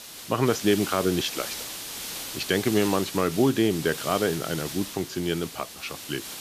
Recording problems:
high frequencies cut off; noticeable; nothing above 8 kHz
hiss; loud; throughout; 8 dB below the speech

